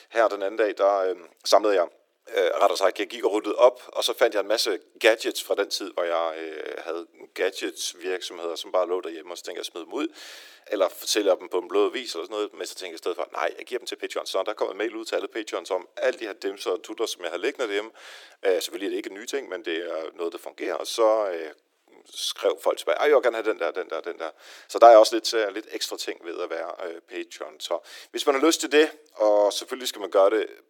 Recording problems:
thin; very; fading below 350 Hz
uneven, jittery; strongly; from 1.5 to 30 s

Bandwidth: 17.5 kHz